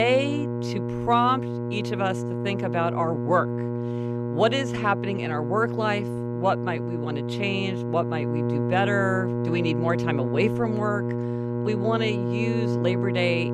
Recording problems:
electrical hum; loud; throughout; 60 Hz, 6 dB below the speech
abrupt cut into speech; at the start

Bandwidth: 14.5 kHz